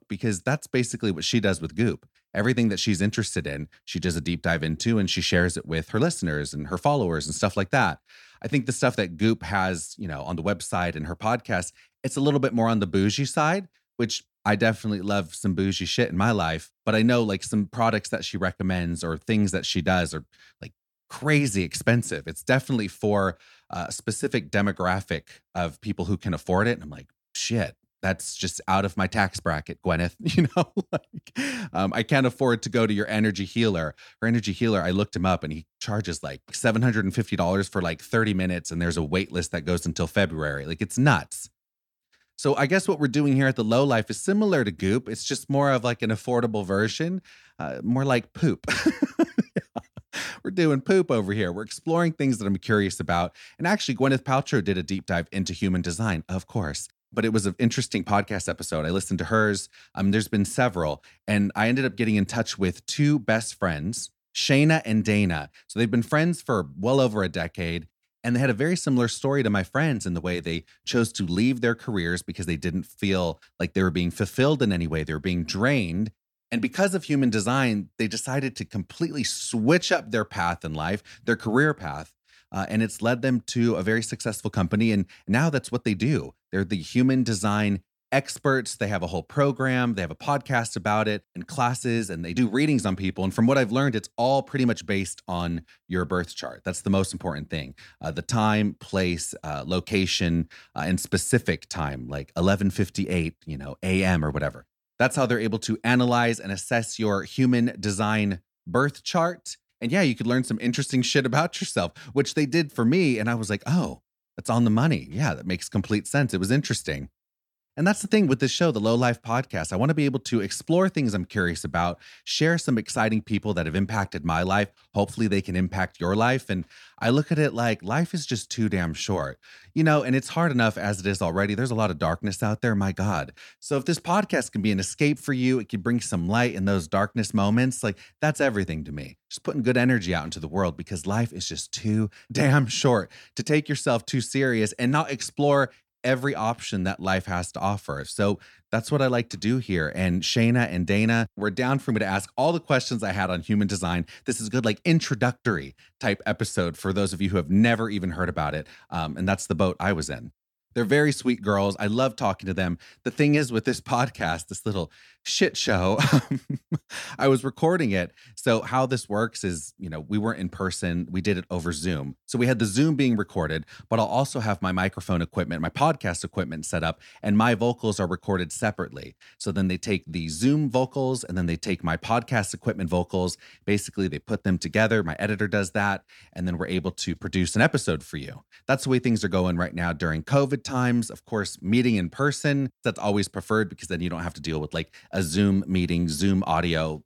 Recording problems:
none

